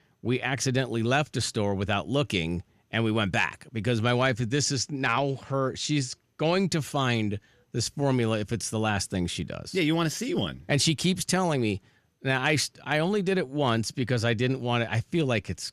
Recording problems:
none

